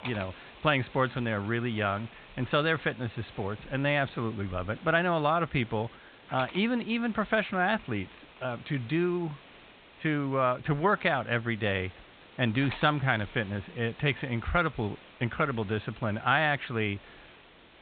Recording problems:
high frequencies cut off; severe; nothing above 4 kHz
hiss; faint; throughout; 20 dB below the speech

